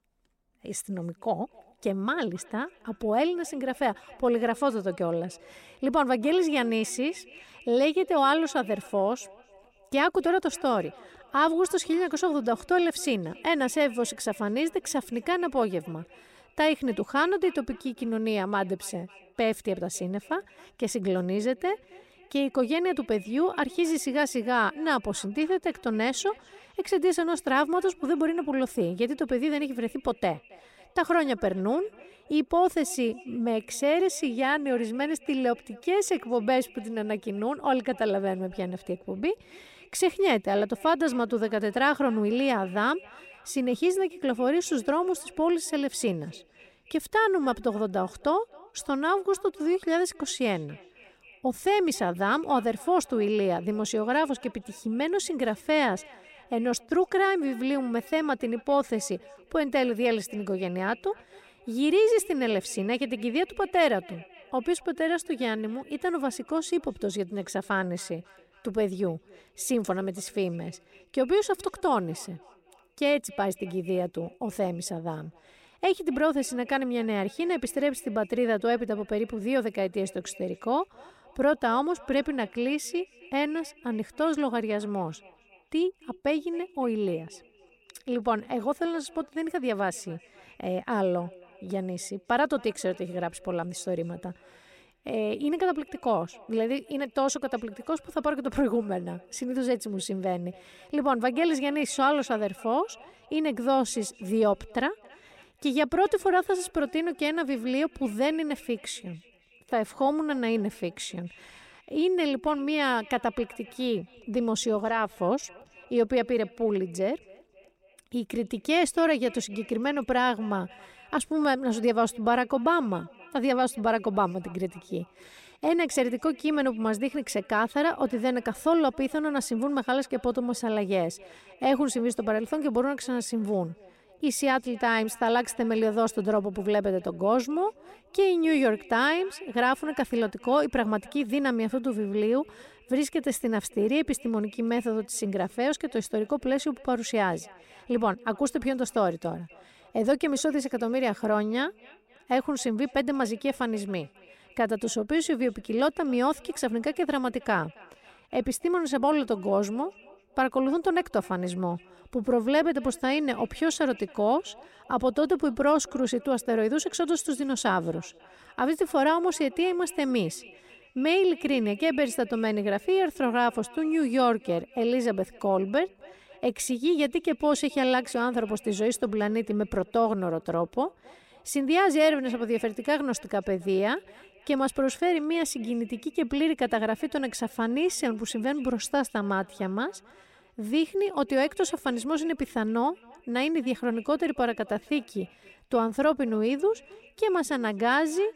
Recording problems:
echo of what is said; faint; throughout; 270 ms later, 25 dB below the speech

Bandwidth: 16 kHz